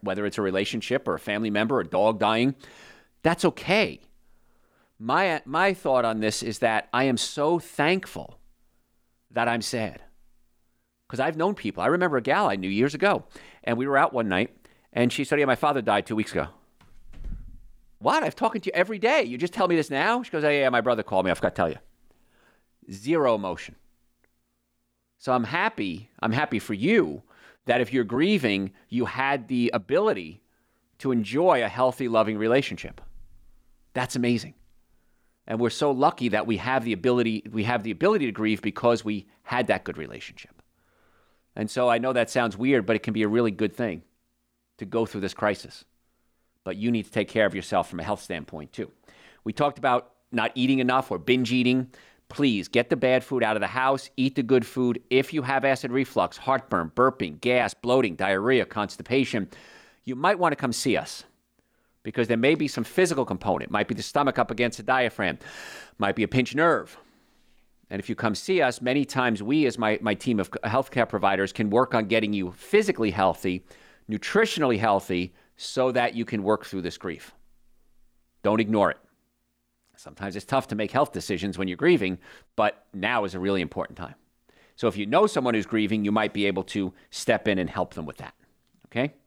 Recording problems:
none

